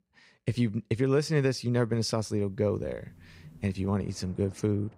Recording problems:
rain or running water; faint; from 2.5 s on; 25 dB below the speech

